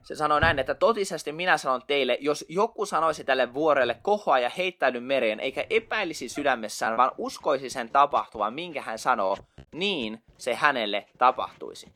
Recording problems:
household noises; noticeable; throughout; 20 dB below the speech
choppy; occasionally; from 7 to 10 s; 3% of the speech affected

